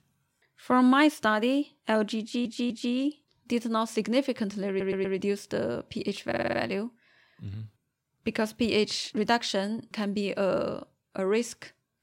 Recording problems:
audio stuttering; at 2 s, at 4.5 s and at 6.5 s

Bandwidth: 16 kHz